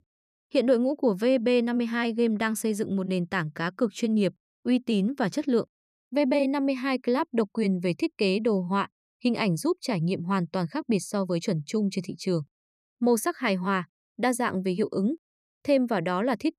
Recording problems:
none

